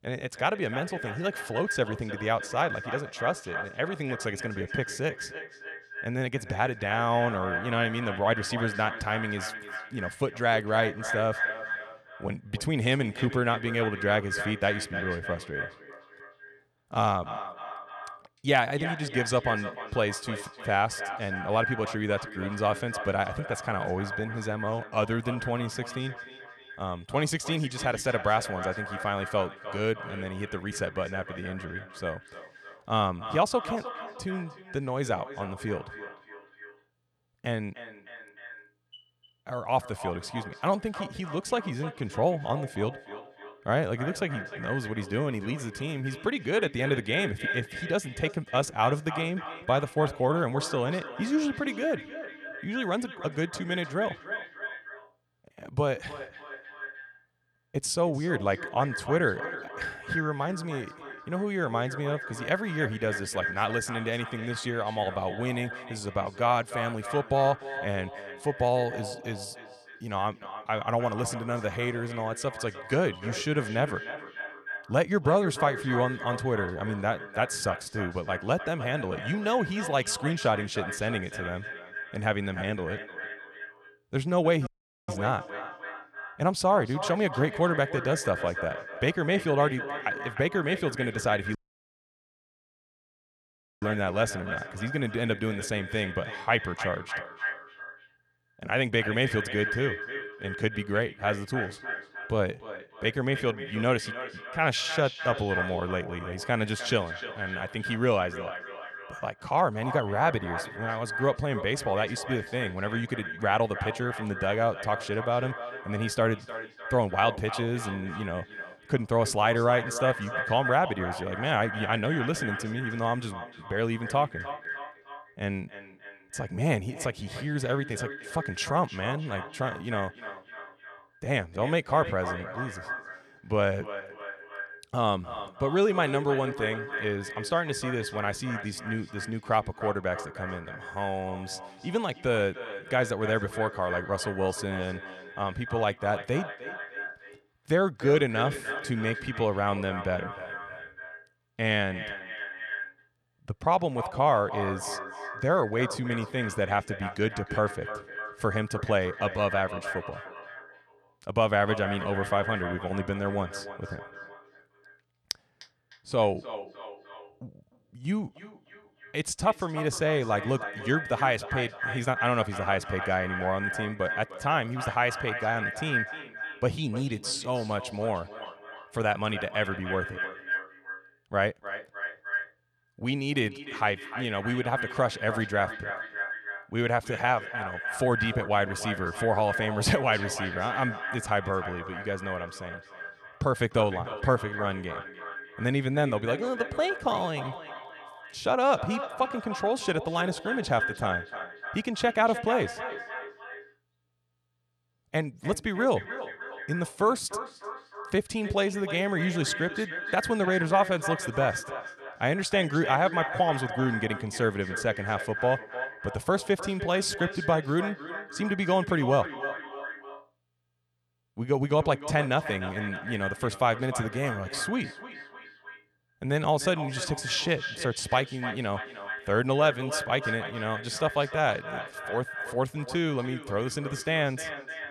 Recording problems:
echo of what is said; strong; throughout; 300 ms later, 8 dB below the speech
audio cutting out; at 1:25 and at 1:32 for 2.5 s

